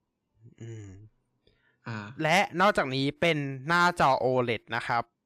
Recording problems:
none

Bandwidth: 15 kHz